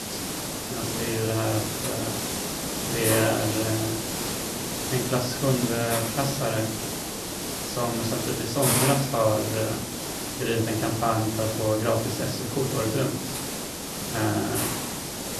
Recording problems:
off-mic speech; far
room echo; slight; dies away in 0.6 s
hiss; loud; throughout; 1 dB below the speech

